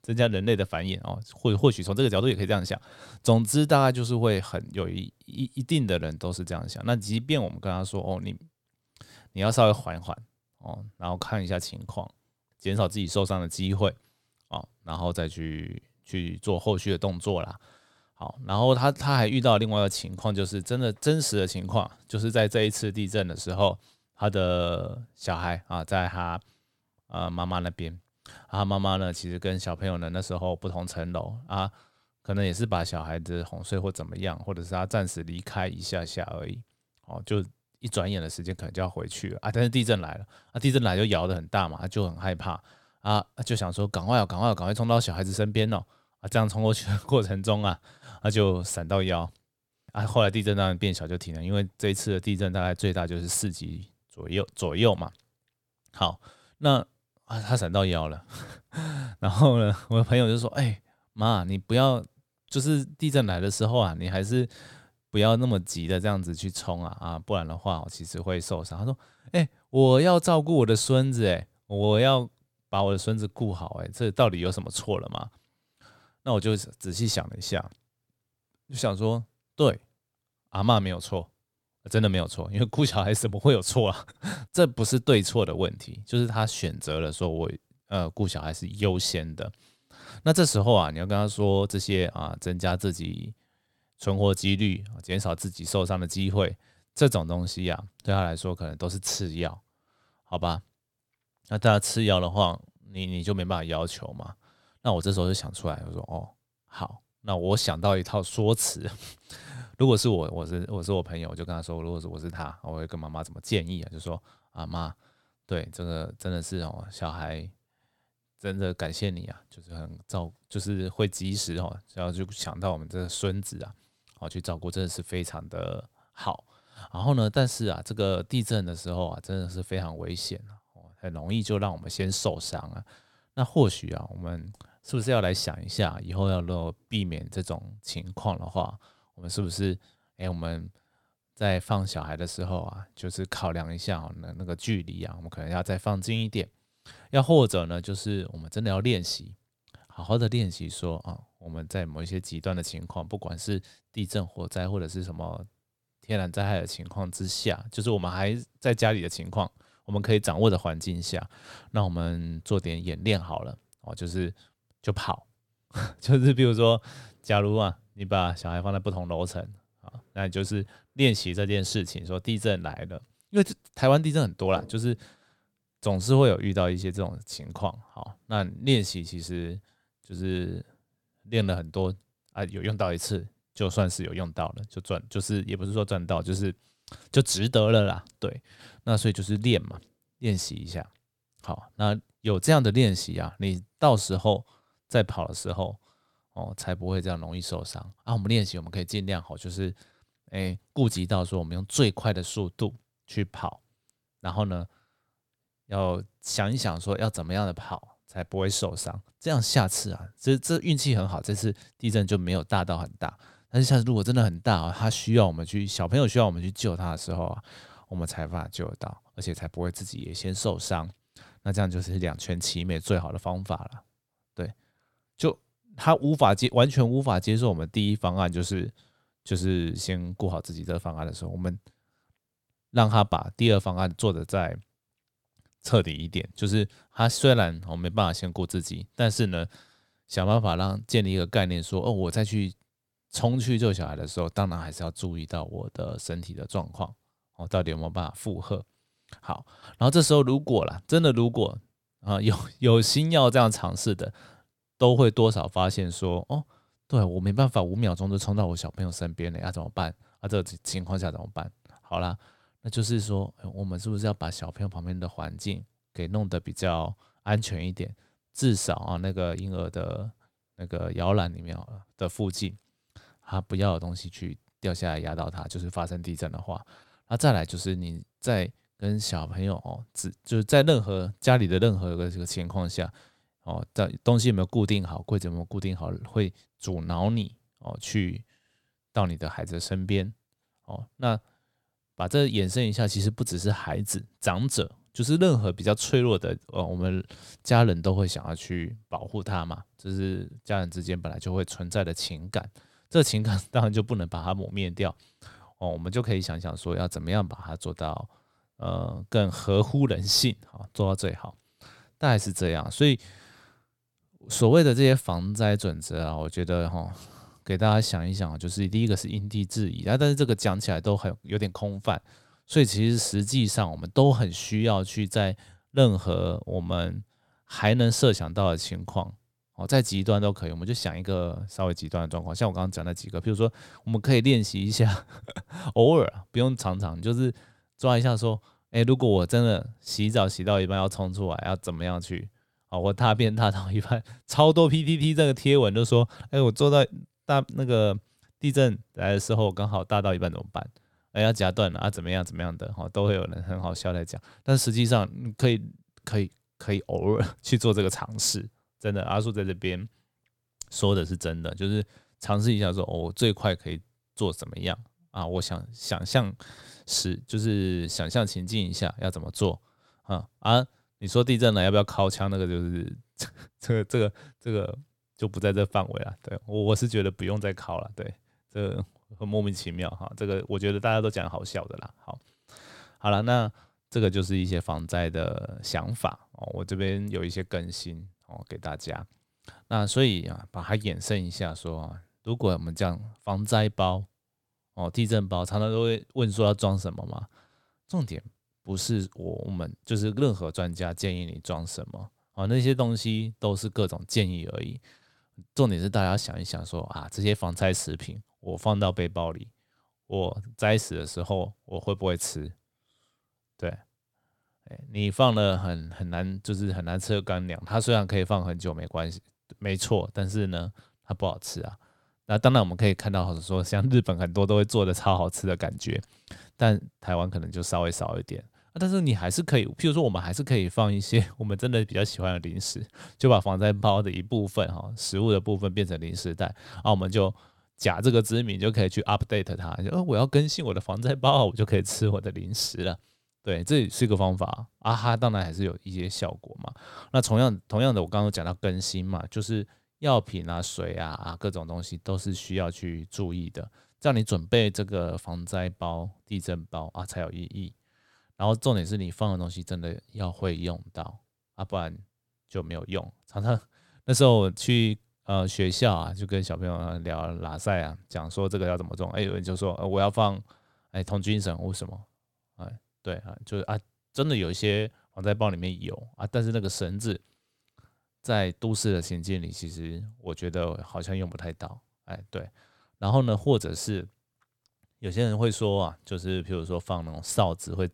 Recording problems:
none

